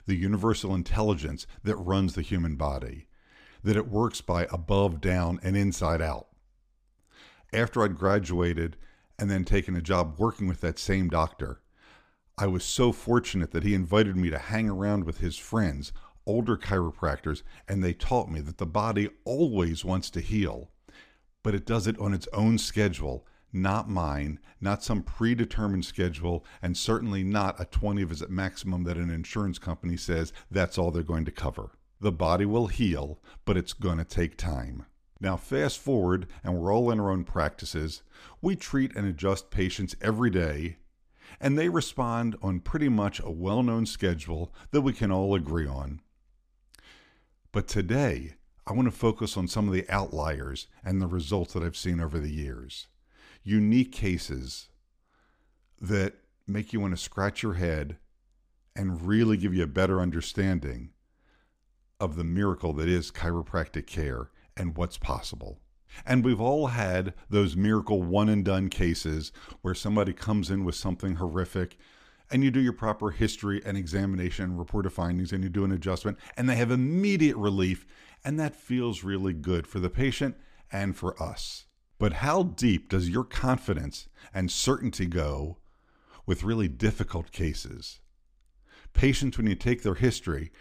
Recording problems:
none

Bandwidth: 15 kHz